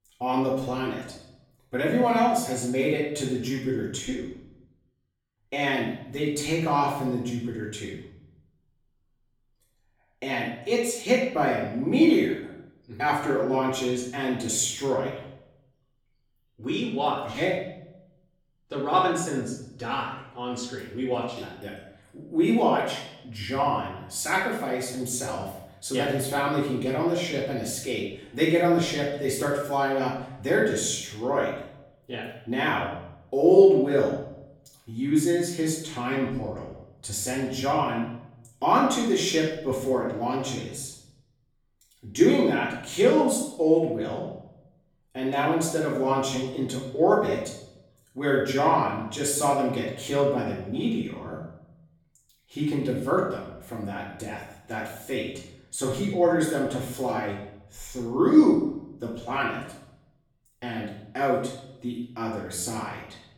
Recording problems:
off-mic speech; far
room echo; noticeable; dies away in 0.7 s

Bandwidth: 18 kHz